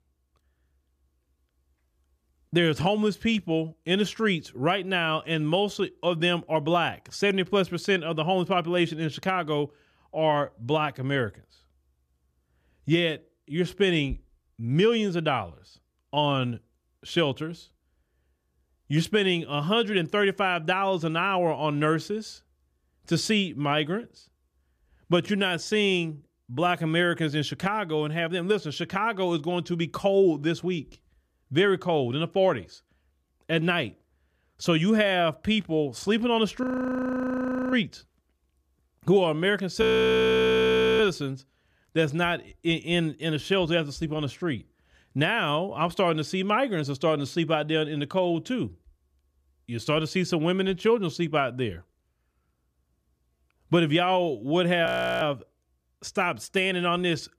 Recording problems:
audio freezing; at 37 s for 1 s, at 40 s for 1 s and at 55 s

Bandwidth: 14.5 kHz